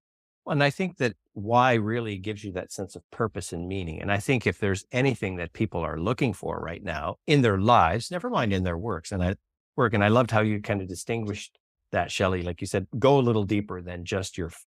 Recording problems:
none

